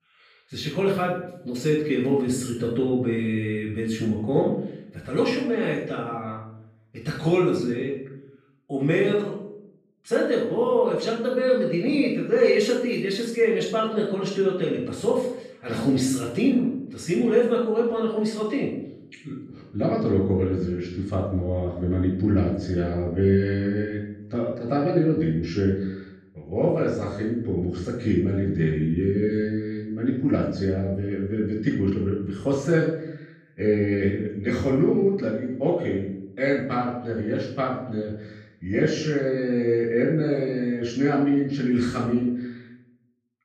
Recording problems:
off-mic speech; far
room echo; noticeable; dies away in 0.7 s

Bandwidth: 15 kHz